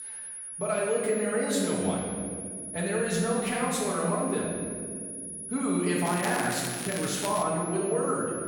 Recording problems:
room echo; strong; dies away in 2.1 s
off-mic speech; far
high-pitched whine; loud; throughout; 10.5 kHz, 7 dB below the speech
crackling; loud; from 6 to 7.5 s; 10 dB below the speech

